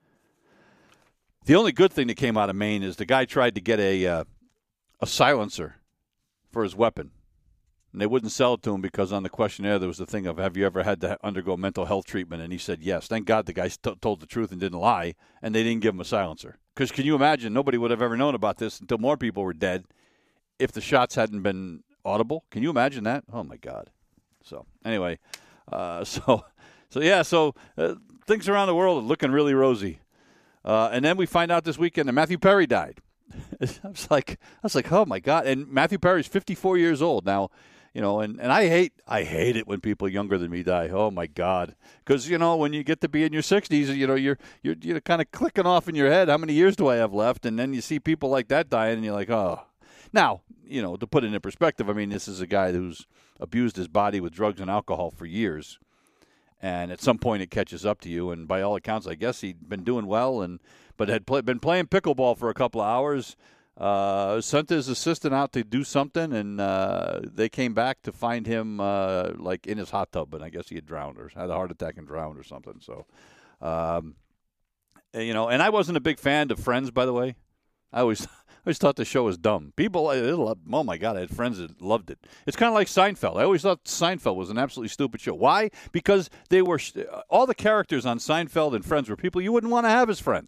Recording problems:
none

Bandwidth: 15 kHz